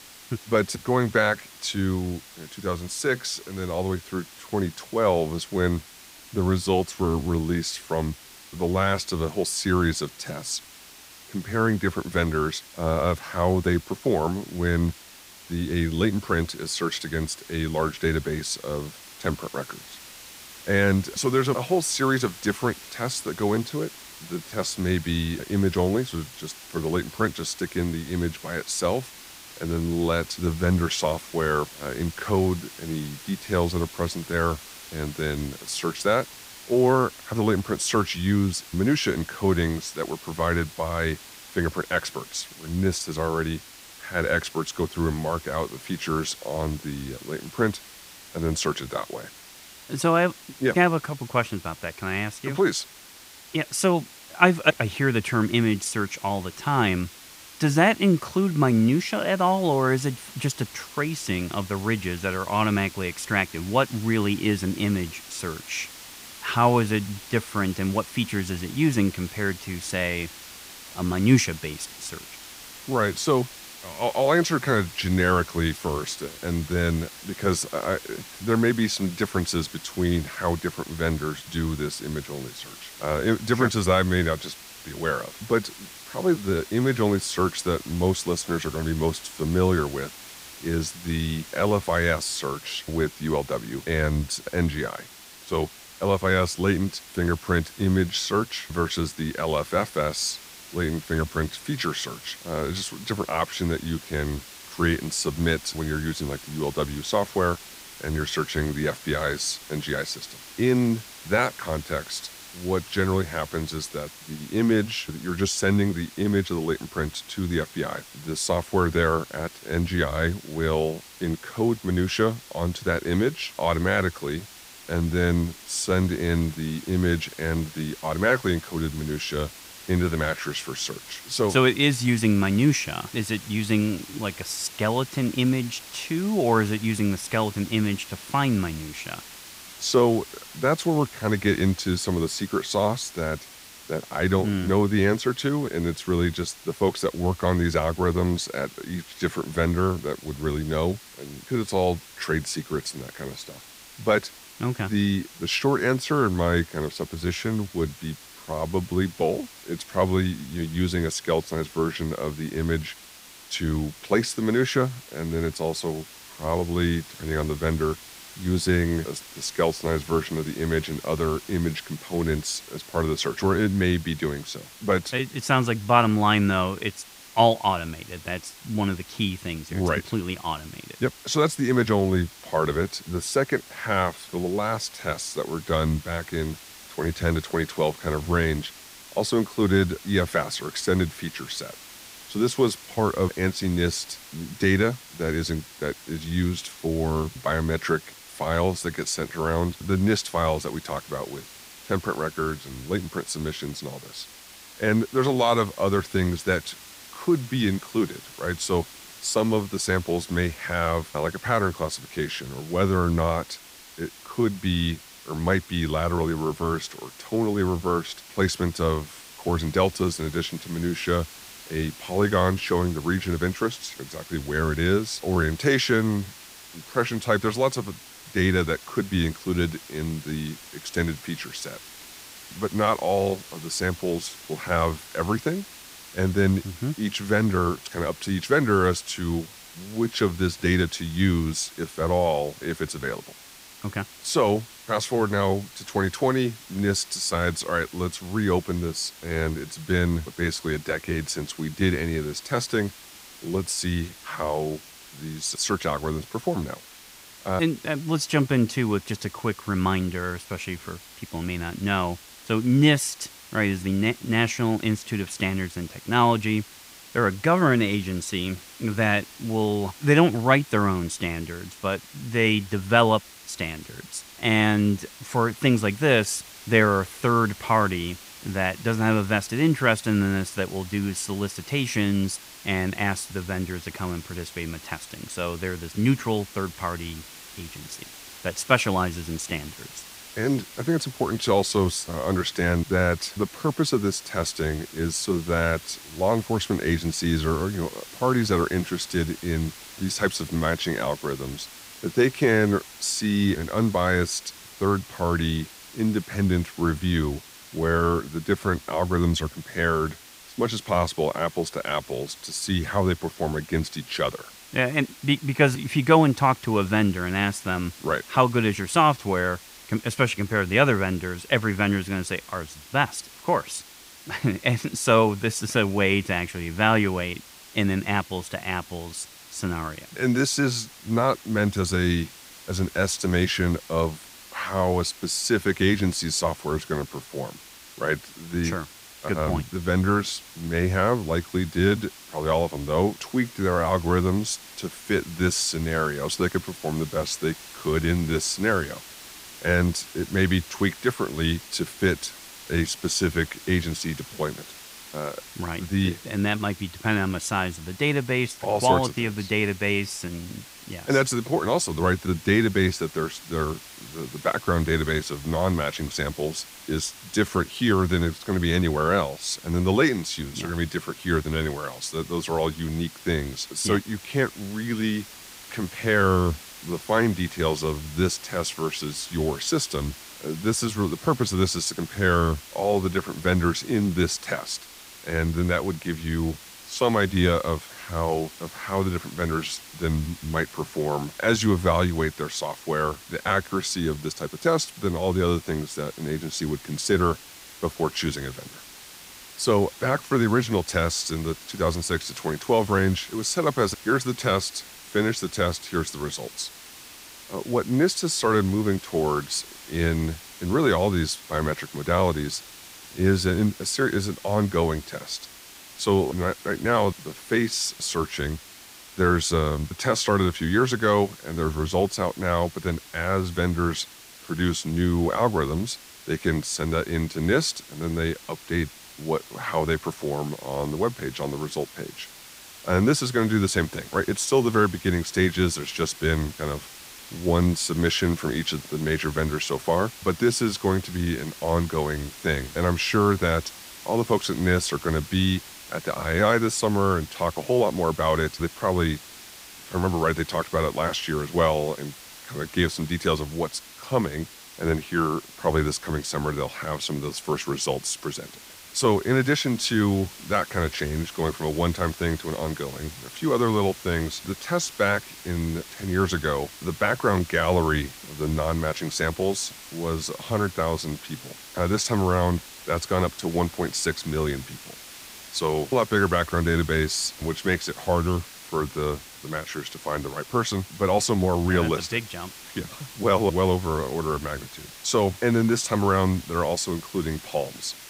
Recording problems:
hiss; noticeable; throughout; 15 dB below the speech

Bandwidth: 15.5 kHz